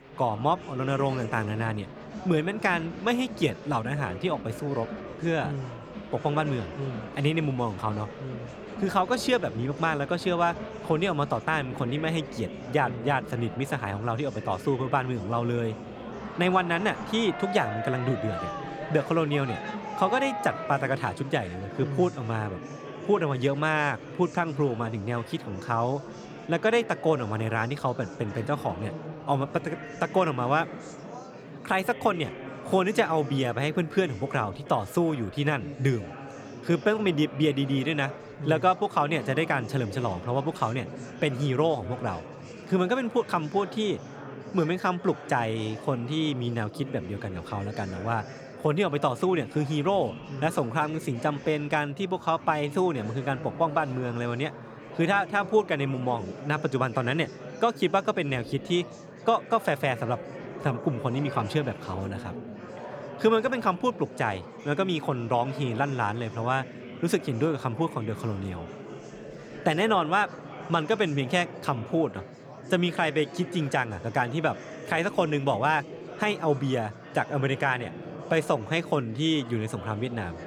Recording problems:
murmuring crowd; noticeable; throughout; 10 dB below the speech

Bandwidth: 18.5 kHz